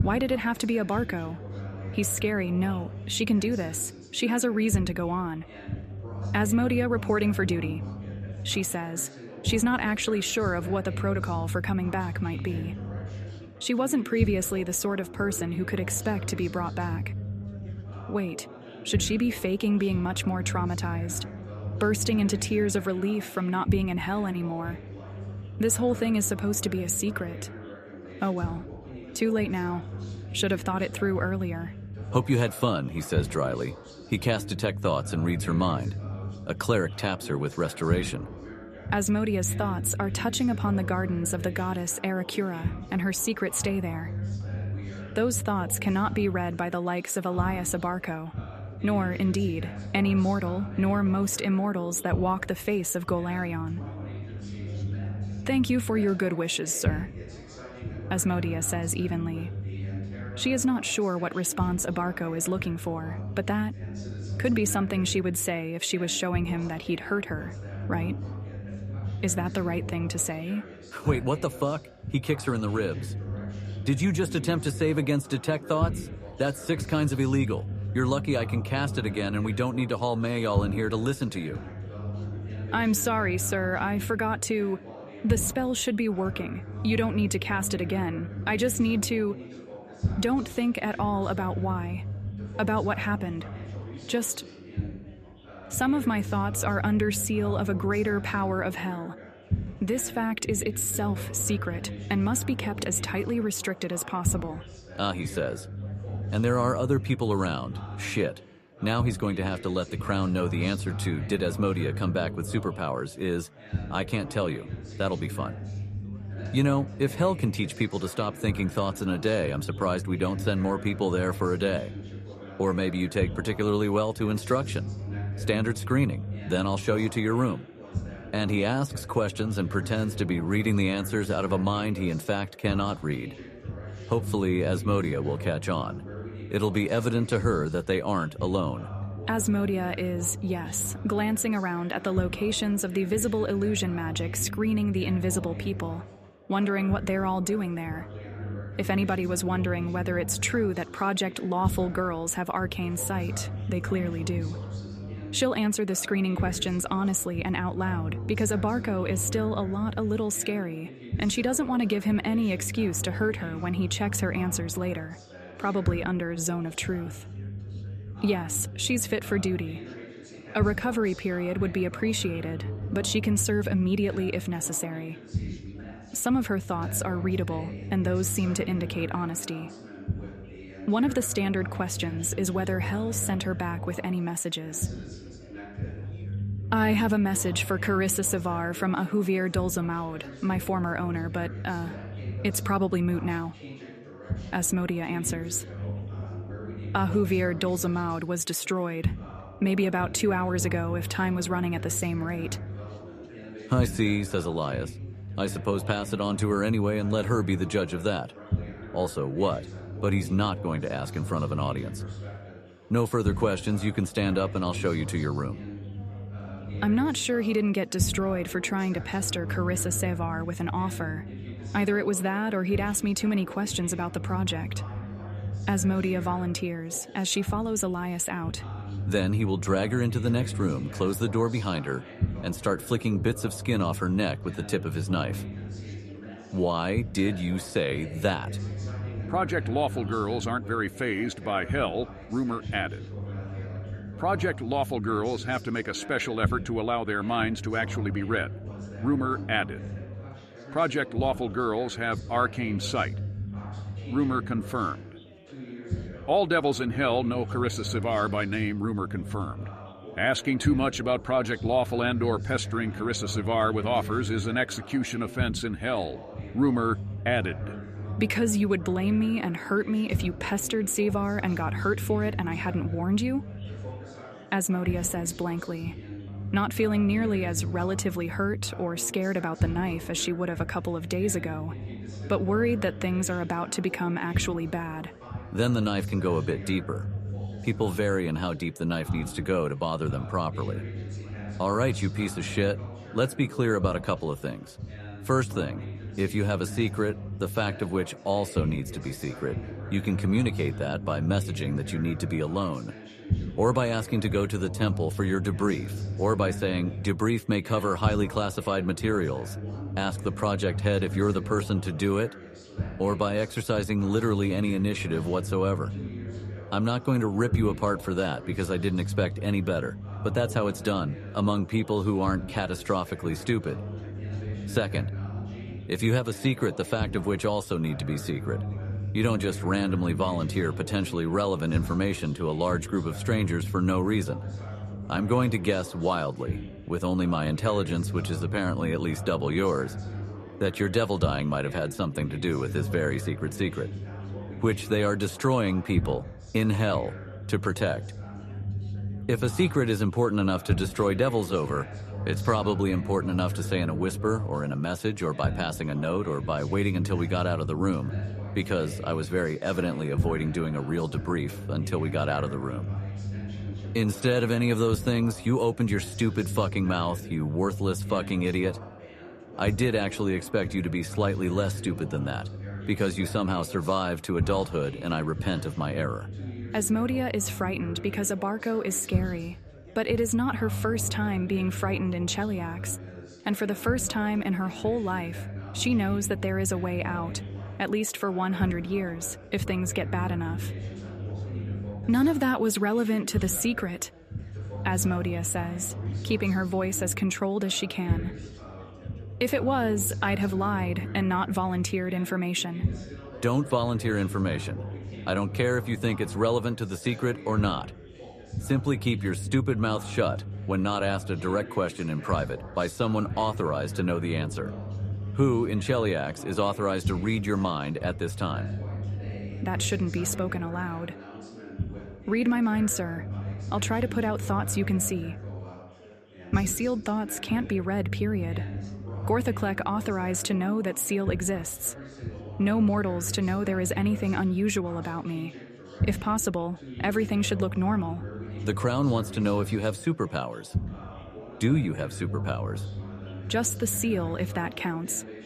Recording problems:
background chatter; noticeable; throughout; 4 voices, 15 dB below the speech
low rumble; noticeable; throughout; 20 dB below the speech

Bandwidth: 14.5 kHz